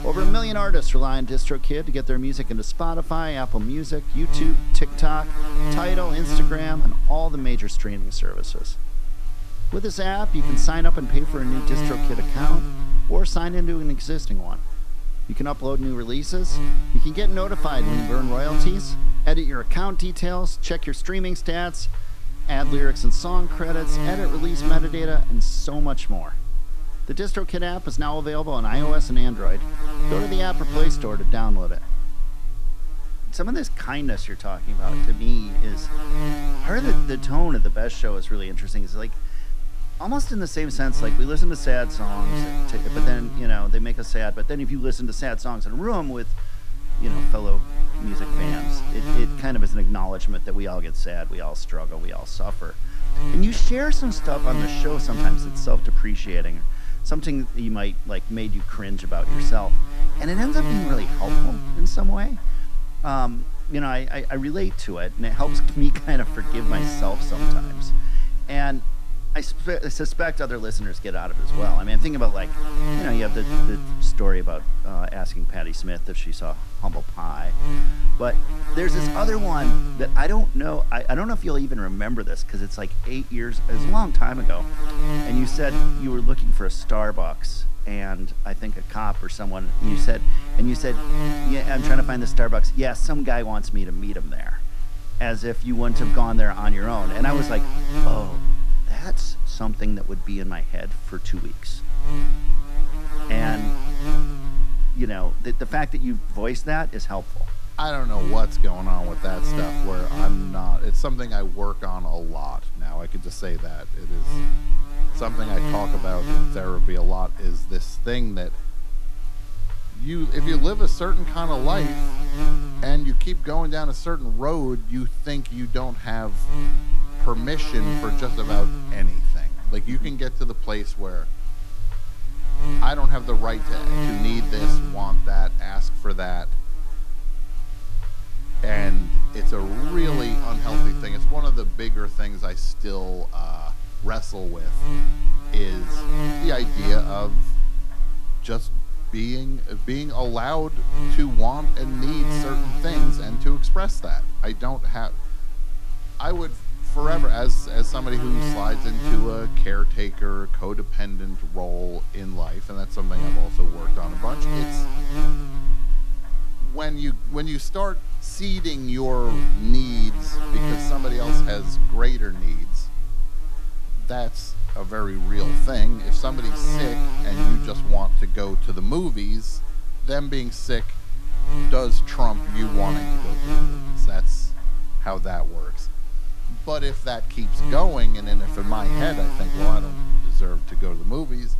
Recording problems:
electrical hum; loud; throughout; 60 Hz, 7 dB below the speech

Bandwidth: 14.5 kHz